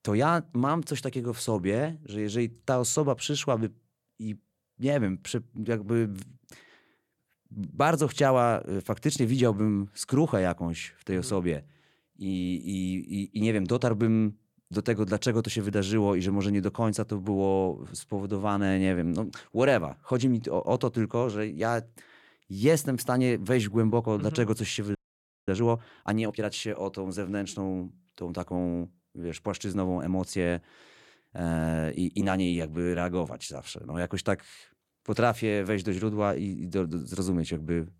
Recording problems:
audio freezing; at 25 s for 0.5 s

